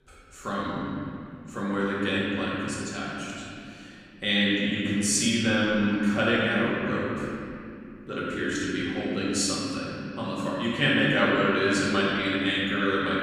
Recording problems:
room echo; strong; dies away in 2.8 s
off-mic speech; far

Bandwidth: 15 kHz